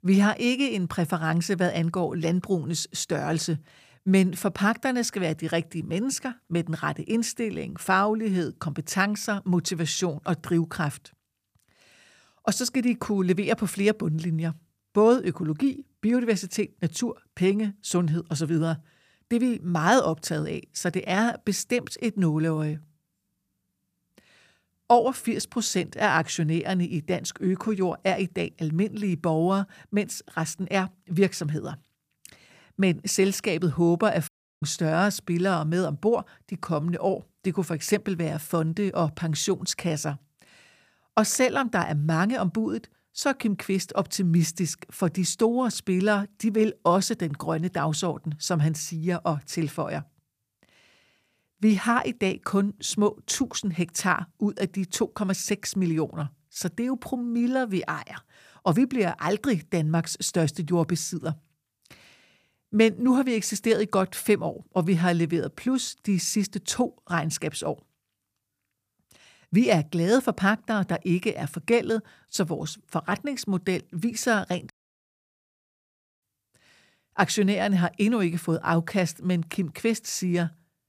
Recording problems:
audio cutting out; at 34 s and at 1:15 for 1.5 s

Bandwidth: 15 kHz